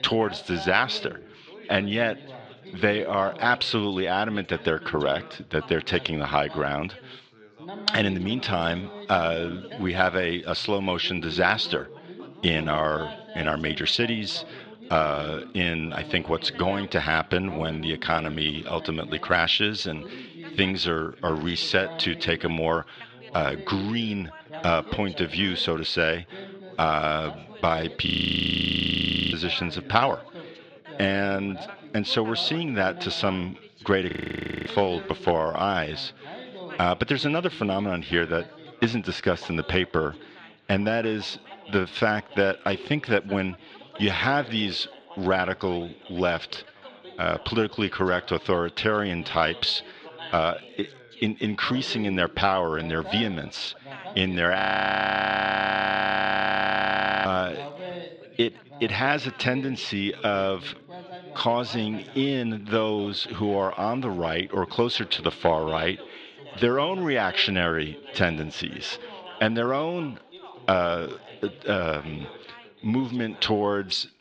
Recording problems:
muffled; very slightly; fading above 3.5 kHz
thin; very slightly; fading below 350 Hz
background chatter; noticeable; throughout; 3 voices, 15 dB below the speech
audio freezing; at 28 s for 1.5 s, at 34 s for 0.5 s and at 55 s for 2.5 s

